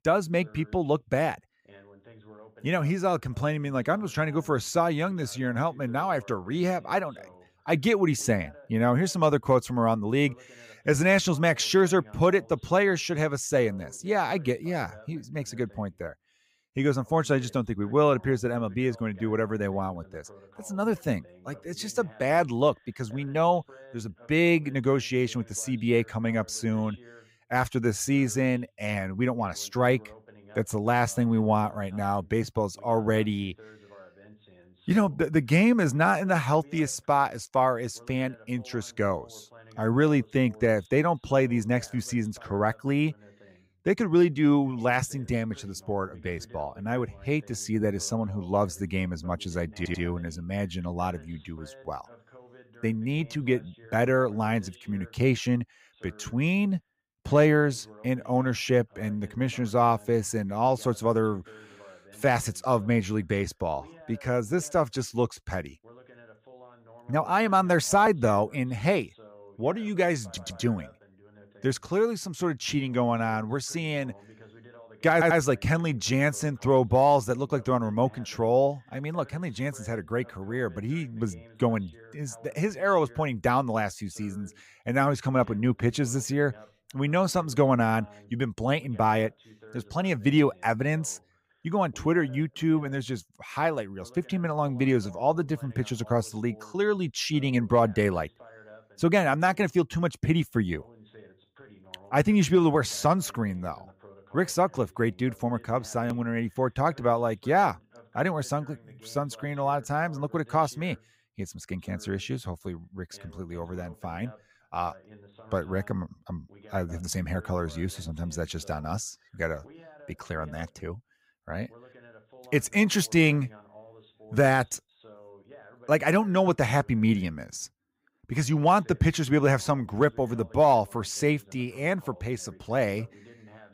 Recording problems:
voice in the background; faint; throughout; 25 dB below the speech
audio stuttering; at 50 s, at 1:10 and at 1:15

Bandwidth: 15.5 kHz